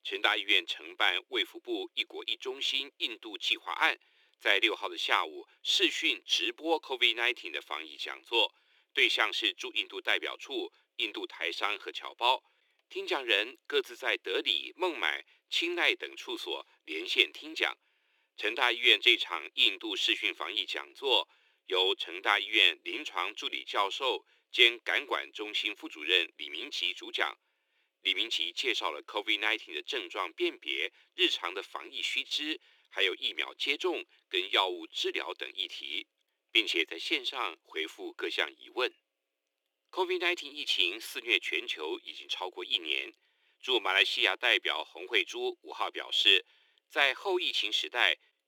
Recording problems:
thin; very; fading below 350 Hz

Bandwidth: 18.5 kHz